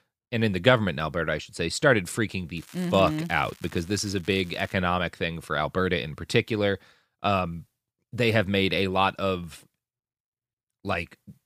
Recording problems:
crackling; faint; from 2.5 to 4.5 s; 25 dB below the speech

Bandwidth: 15 kHz